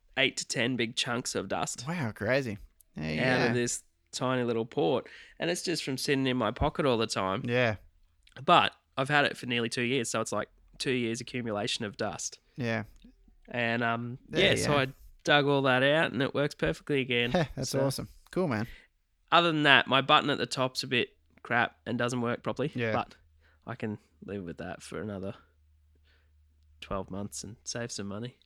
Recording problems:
uneven, jittery; strongly; from 0.5 to 25 s

